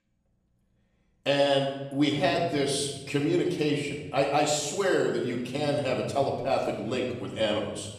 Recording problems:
off-mic speech; far
room echo; noticeable; dies away in 1.1 s

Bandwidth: 14.5 kHz